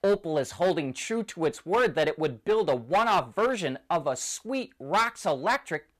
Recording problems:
distortion; slight; 6% of the sound clipped

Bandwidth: 14.5 kHz